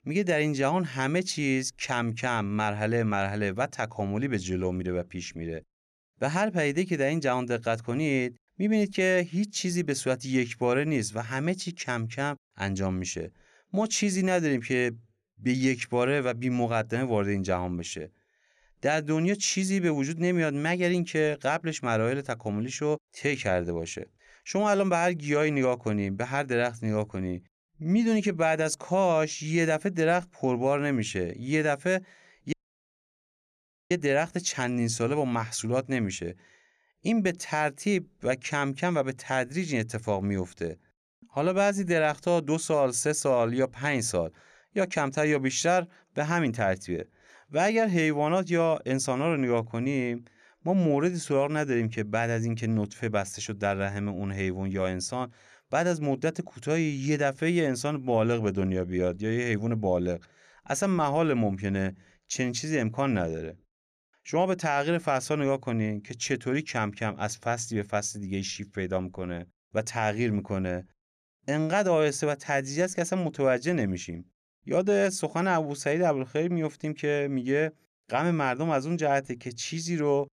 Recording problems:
audio cutting out; at 33 s for 1.5 s

